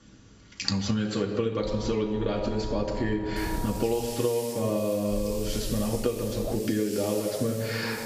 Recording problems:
off-mic speech; far
room echo; noticeable; dies away in 0.9 s
high frequencies cut off; noticeable; nothing above 8 kHz
squashed, flat; somewhat
low rumble; noticeable; from 1.5 to 4 s and from 5 to 6.5 s; 10 dB below the speech
hiss; very faint; from 3.5 s on; 10 dB below the speech

